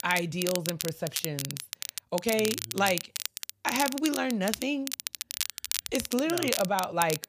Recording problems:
crackle, like an old record; loud; 4 dB below the speech

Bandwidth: 15 kHz